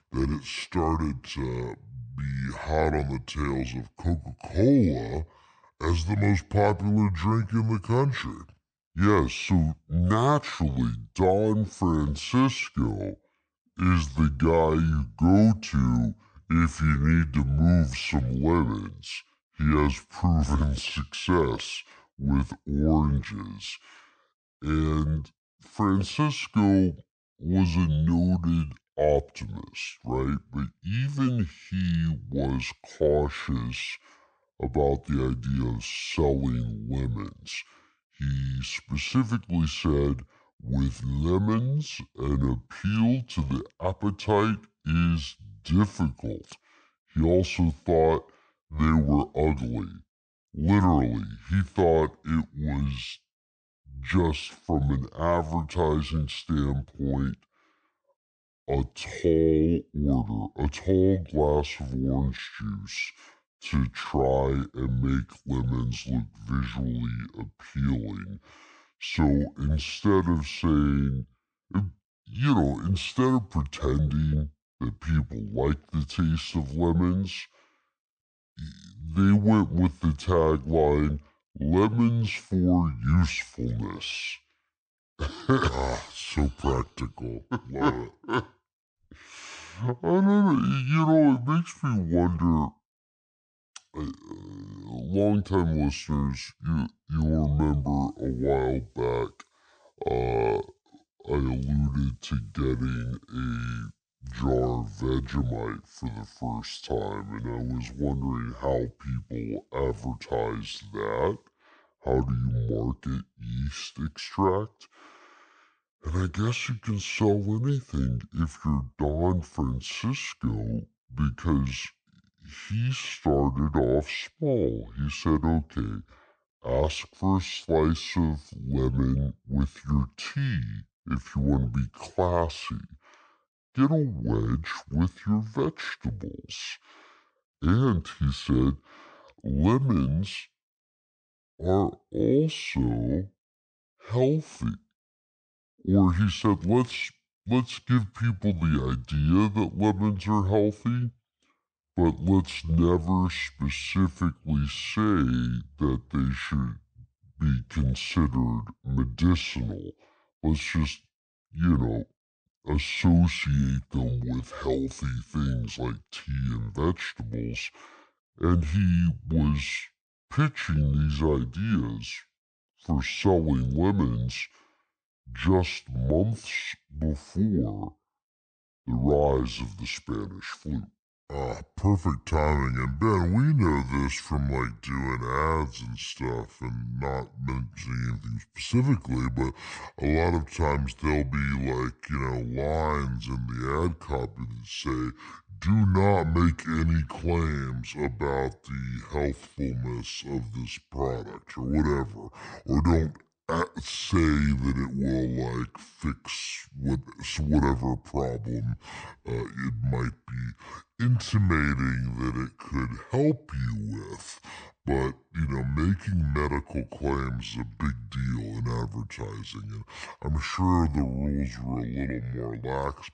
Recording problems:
wrong speed and pitch; too slow and too low; 0.6 times normal speed

